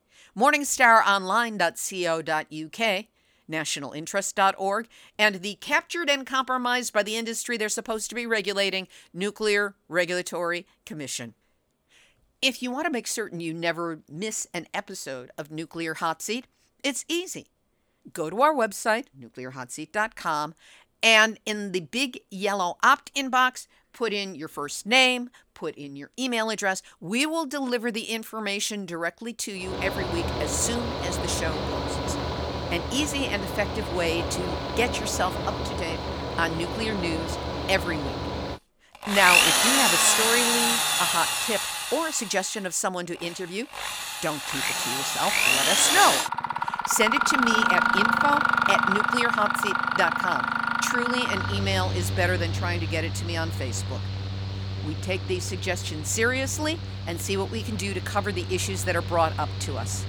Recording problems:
machinery noise; very loud; from 30 s on; 1 dB above the speech

